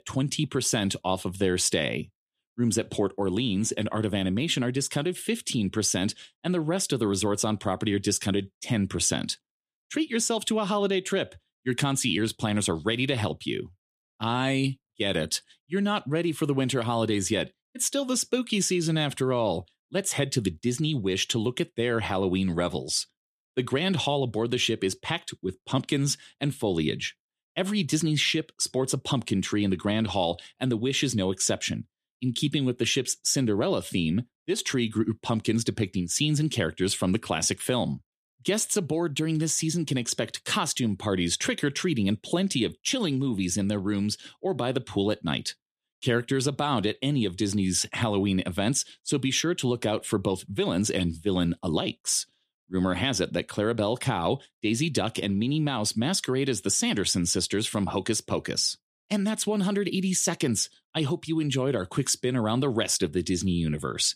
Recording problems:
none

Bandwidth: 14.5 kHz